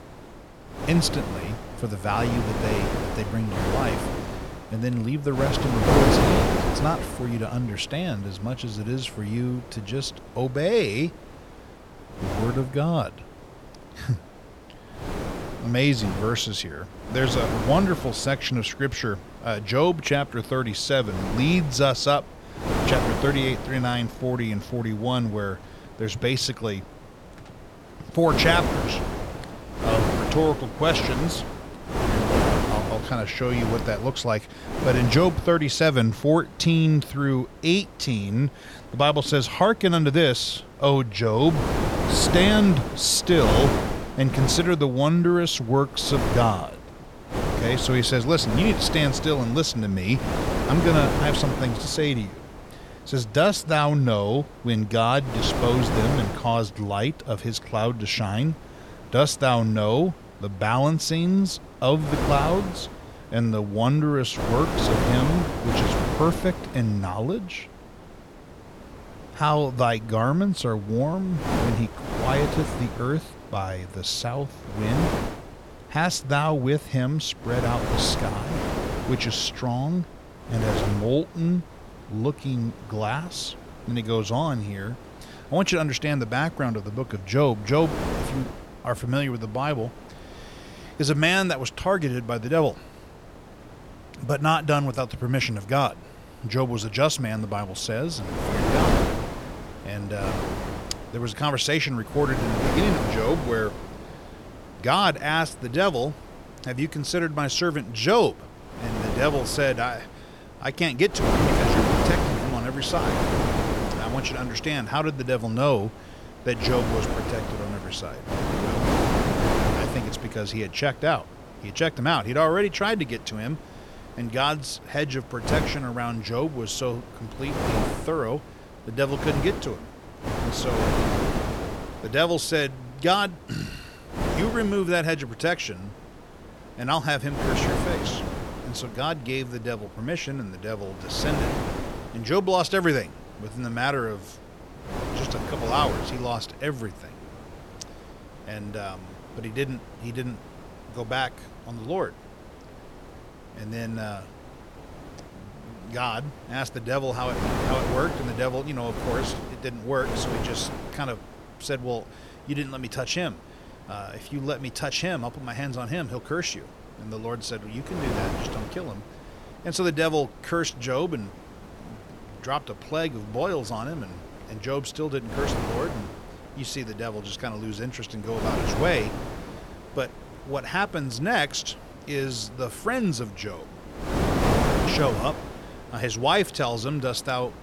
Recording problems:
wind noise on the microphone; heavy; 3 dB below the speech

